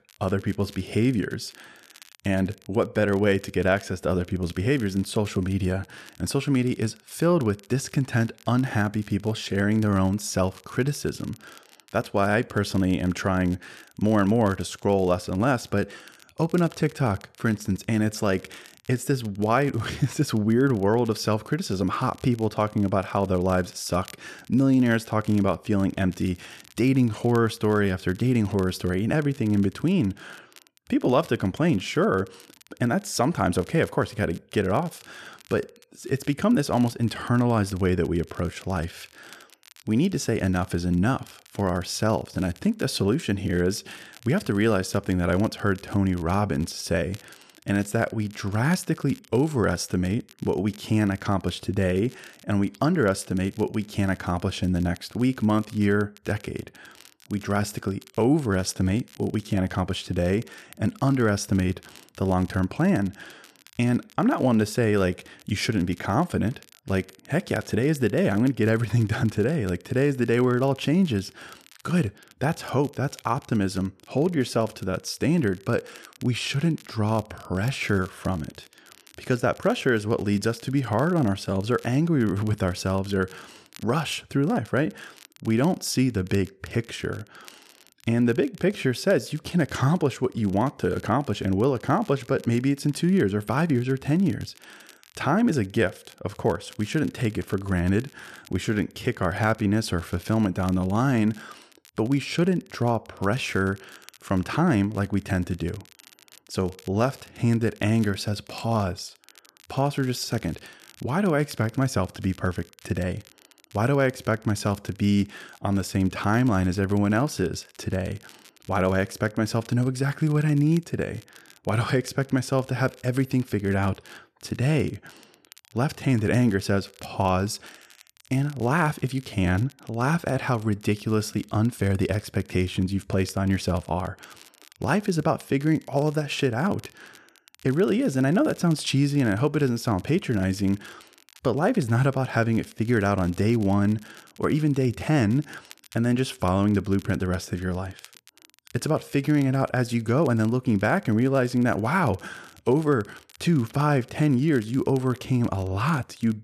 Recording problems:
crackle, like an old record; faint; 25 dB below the speech

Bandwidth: 13.5 kHz